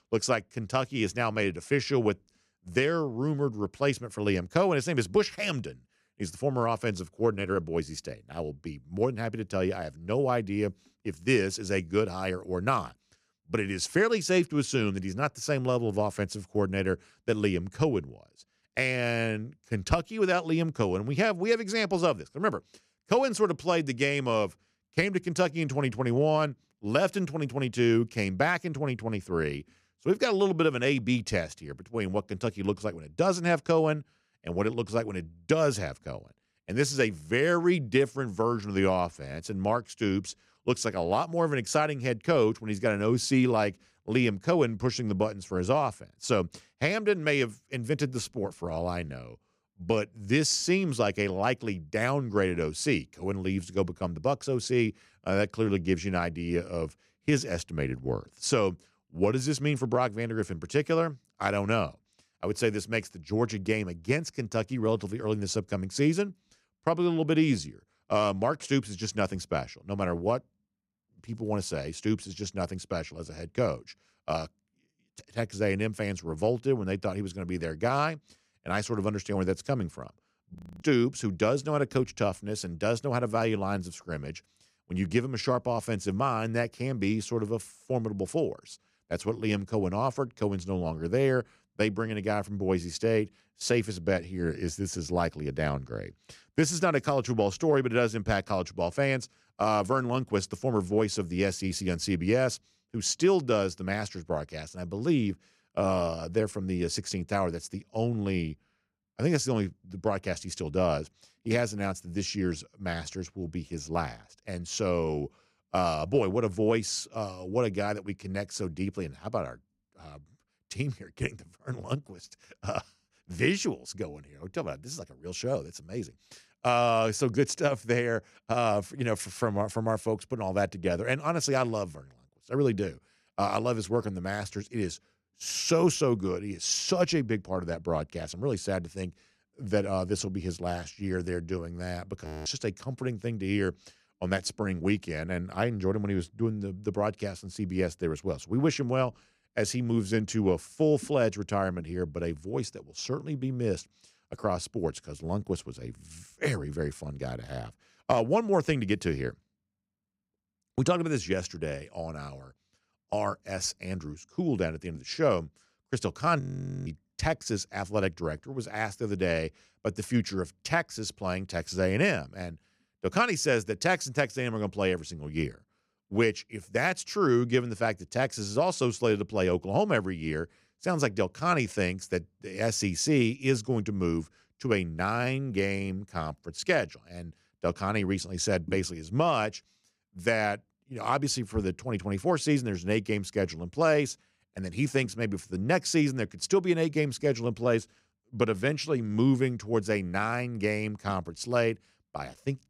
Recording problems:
audio freezing; at 1:21, at 2:22 and at 2:46

